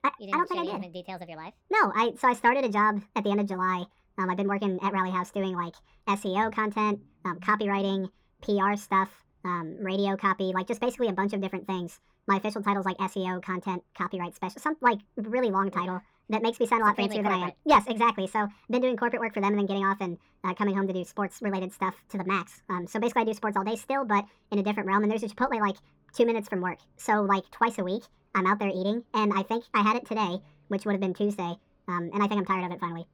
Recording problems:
muffled; very; fading above 3 kHz
wrong speed and pitch; too fast and too high; 1.6 times normal speed

